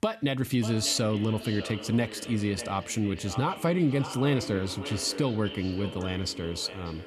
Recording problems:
echo of what is said; strong; throughout; 590 ms later, 10 dB below the speech

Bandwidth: 13.5 kHz